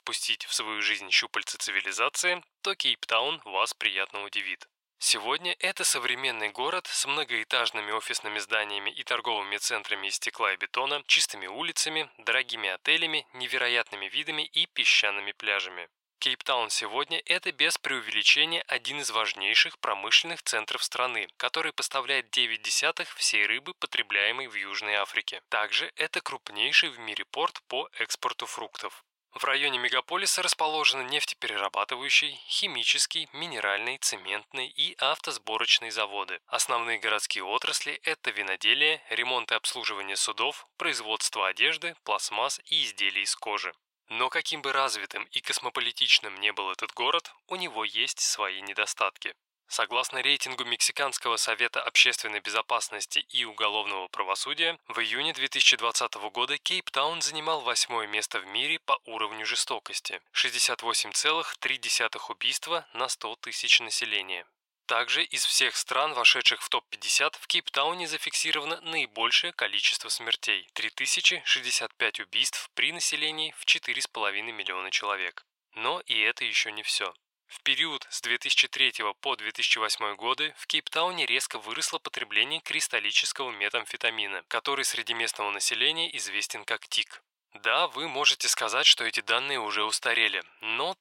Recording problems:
thin; very; fading below 800 Hz

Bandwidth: 16 kHz